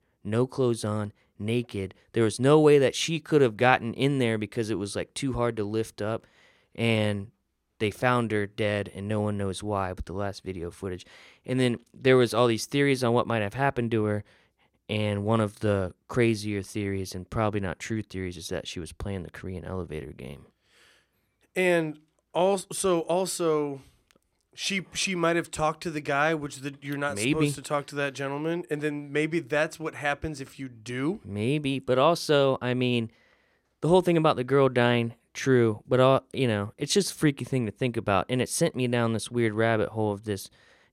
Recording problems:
none

